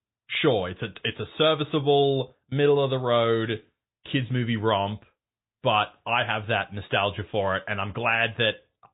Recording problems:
high frequencies cut off; severe; nothing above 3.5 kHz
garbled, watery; slightly

